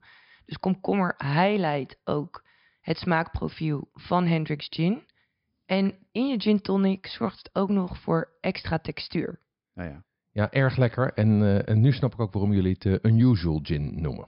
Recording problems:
high frequencies cut off; noticeable; nothing above 5.5 kHz

